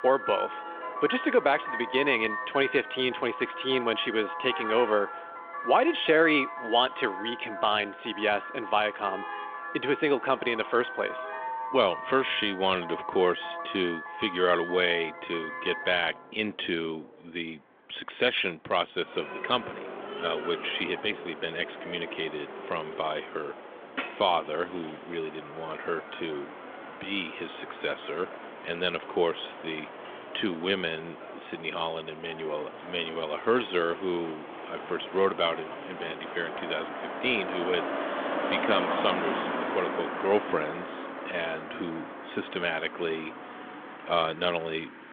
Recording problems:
phone-call audio; nothing above 3.5 kHz
traffic noise; loud; throughout; 8 dB below the speech

